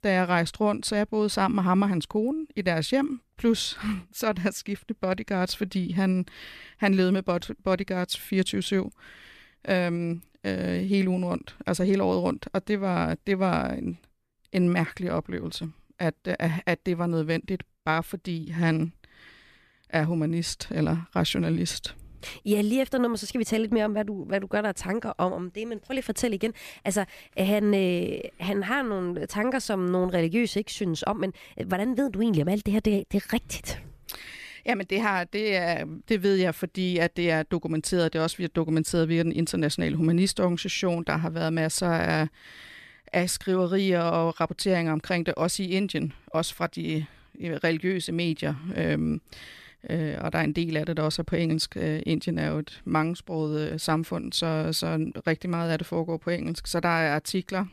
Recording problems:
none

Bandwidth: 14.5 kHz